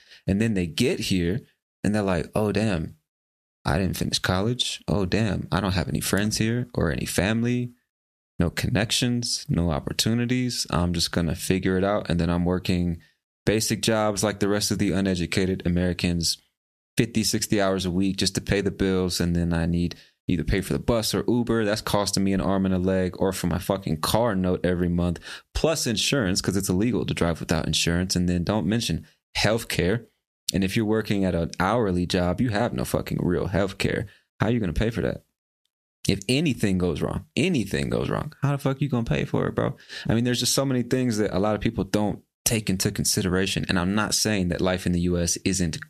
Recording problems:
squashed, flat; somewhat

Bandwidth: 14.5 kHz